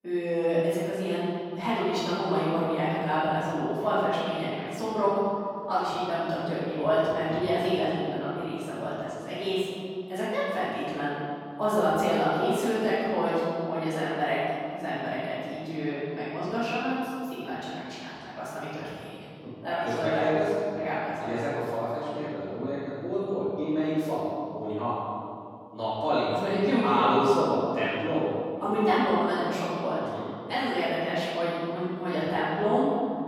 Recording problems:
room echo; strong; dies away in 2.4 s
off-mic speech; far

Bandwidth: 17 kHz